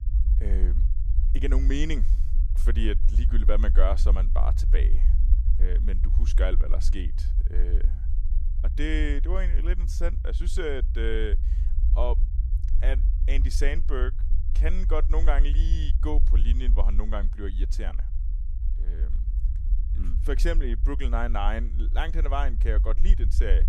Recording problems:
low rumble; noticeable; throughout; 15 dB below the speech

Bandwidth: 14.5 kHz